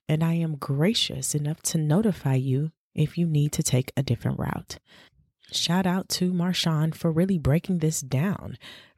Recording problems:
none

